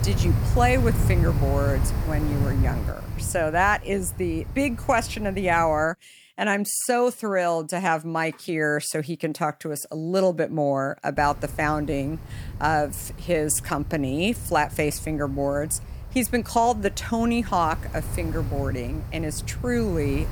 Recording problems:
wind noise on the microphone; occasional gusts; until 6 s and from 11 s on; 15 dB below the speech

